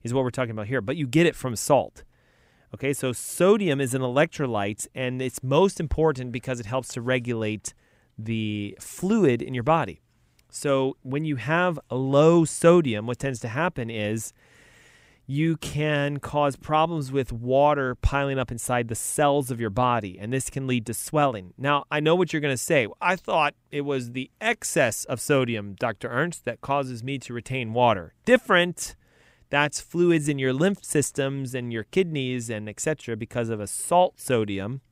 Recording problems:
none

